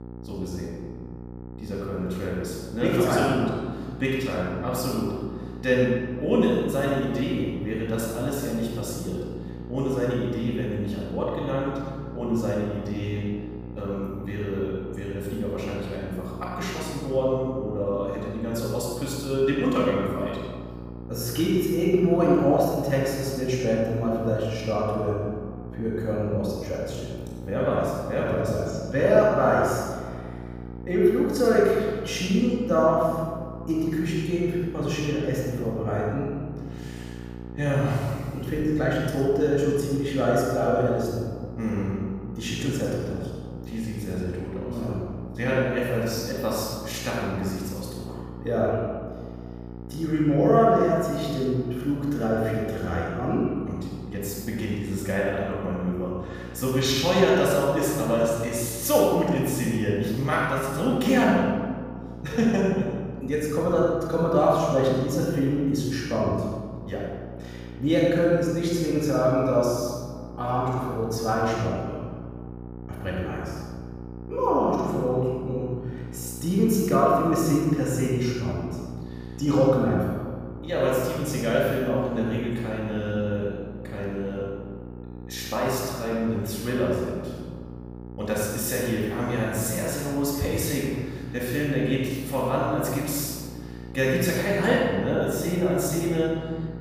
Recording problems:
room echo; strong; dies away in 1.4 s
off-mic speech; far
electrical hum; noticeable; throughout; 60 Hz, 20 dB below the speech

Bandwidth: 15 kHz